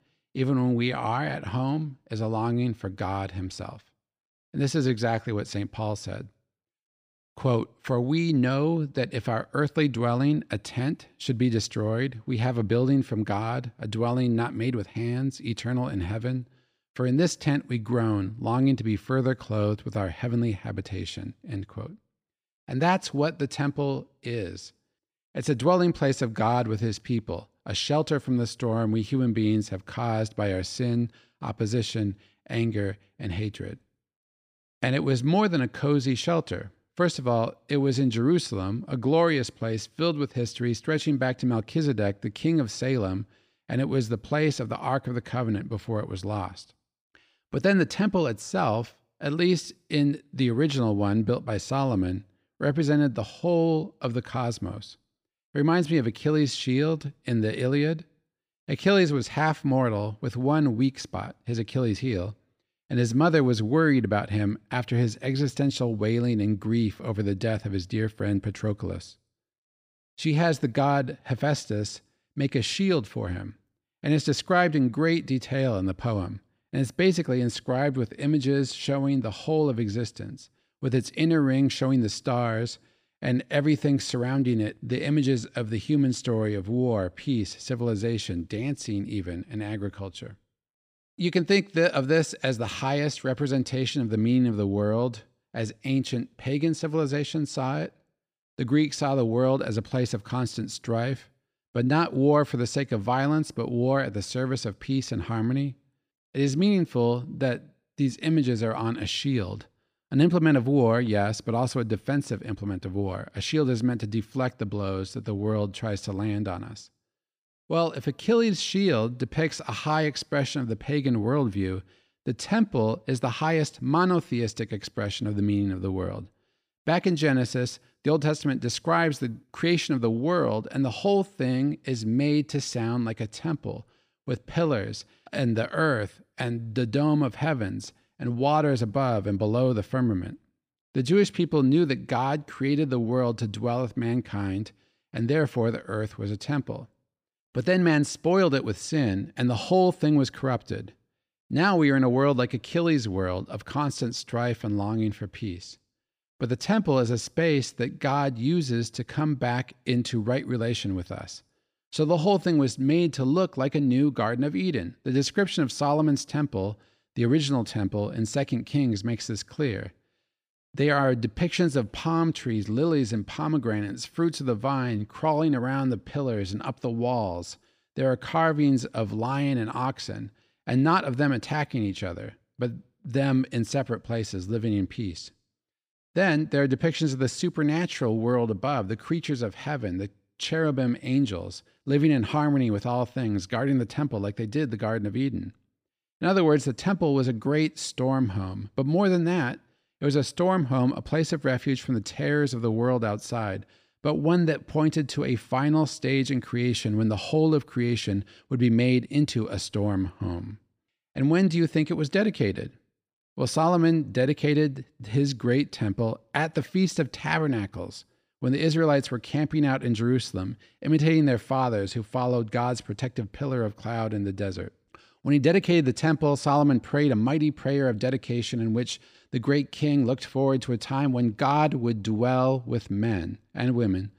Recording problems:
none

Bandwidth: 15 kHz